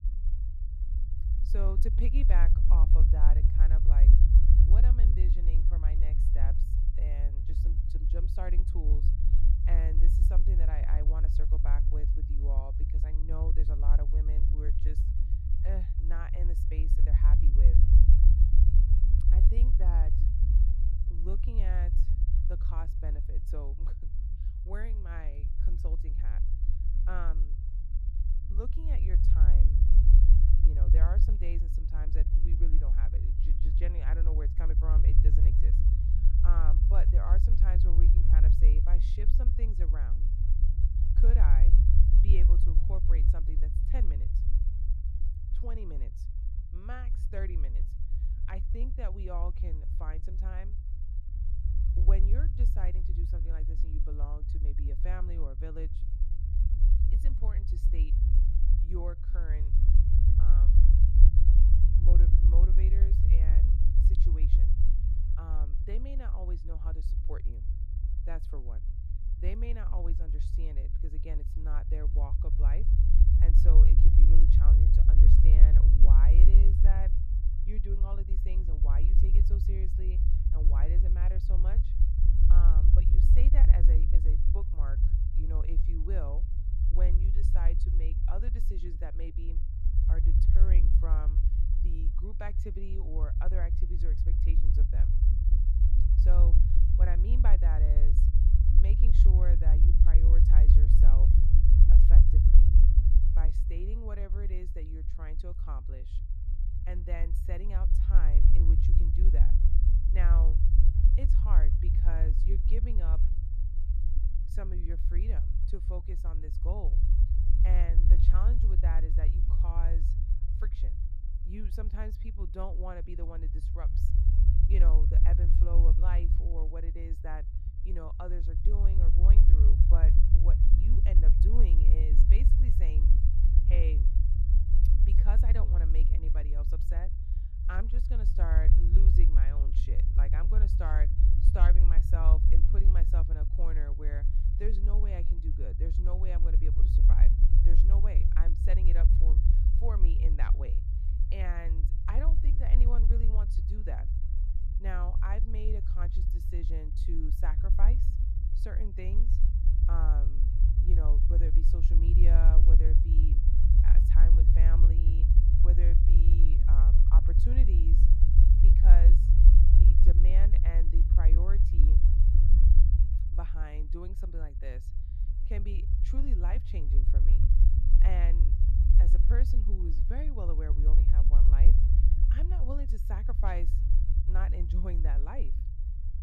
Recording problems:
low rumble; loud; throughout; 1 dB below the speech

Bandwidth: 14.5 kHz